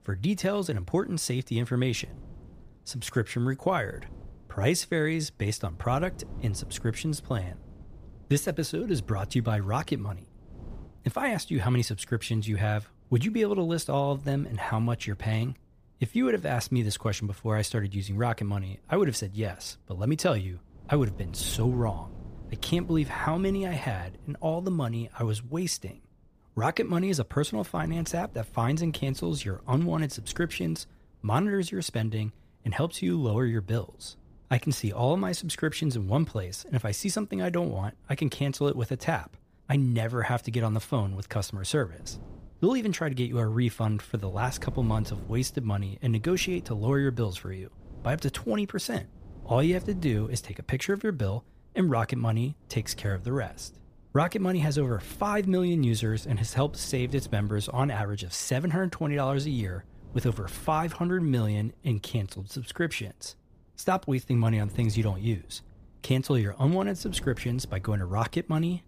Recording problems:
wind noise on the microphone; occasional gusts; 25 dB below the speech

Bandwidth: 15 kHz